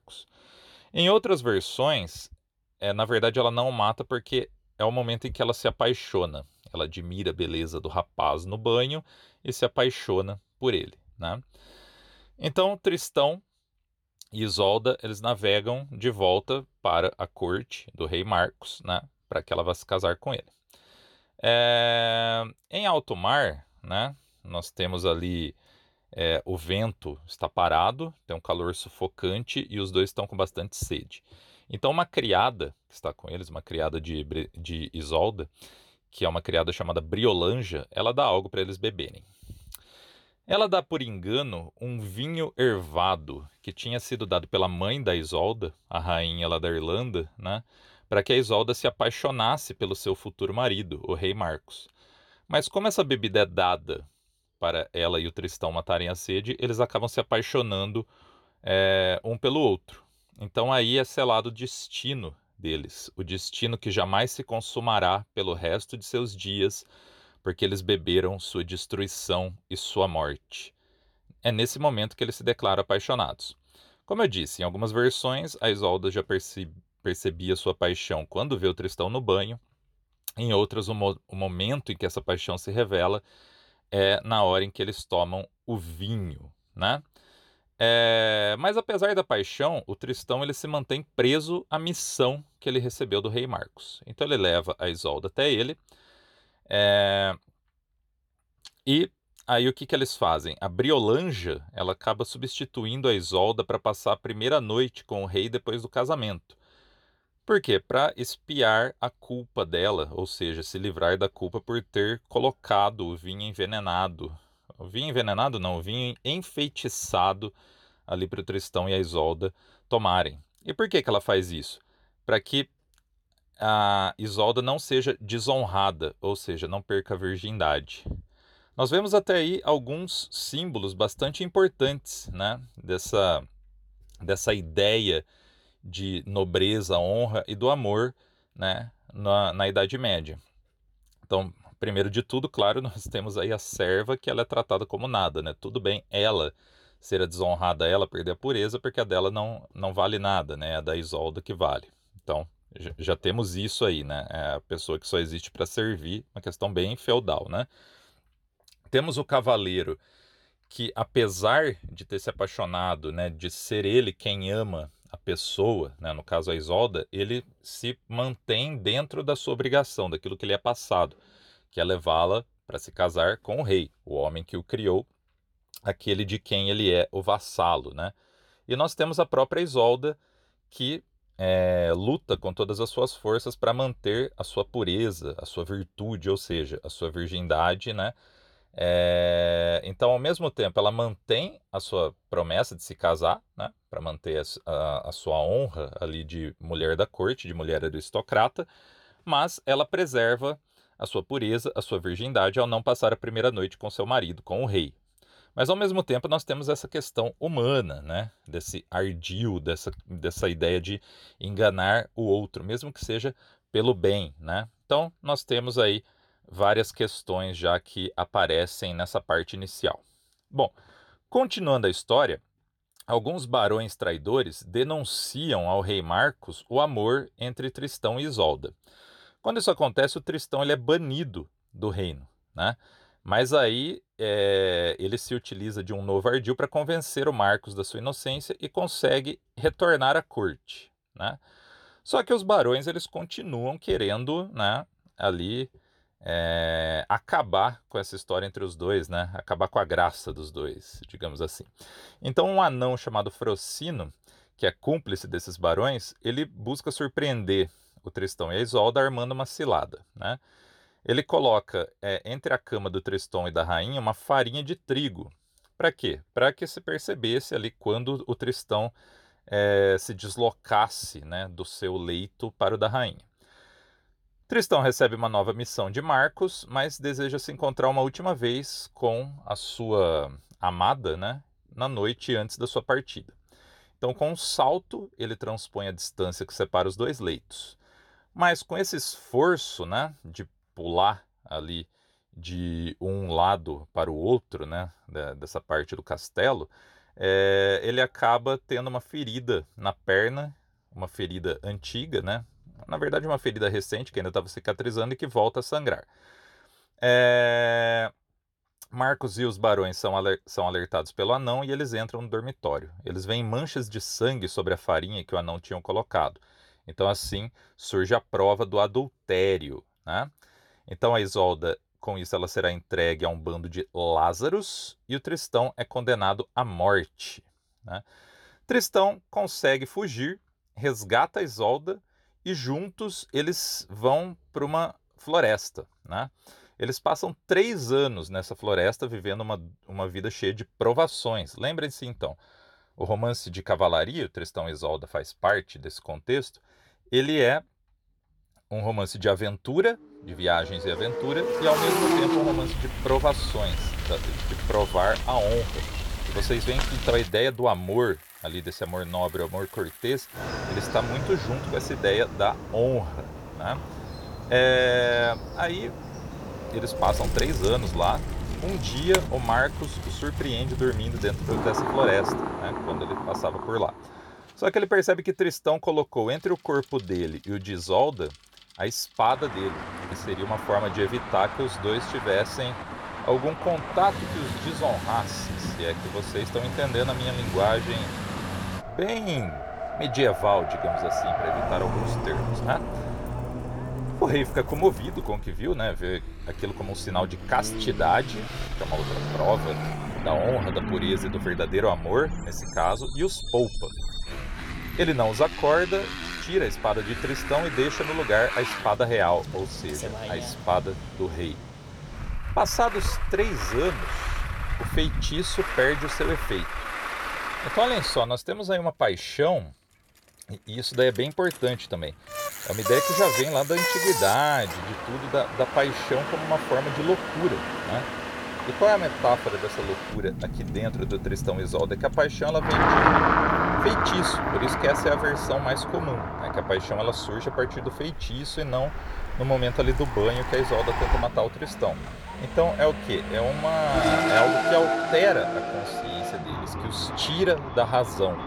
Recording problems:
traffic noise; loud; from 5:50 on; 4 dB below the speech

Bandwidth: 18.5 kHz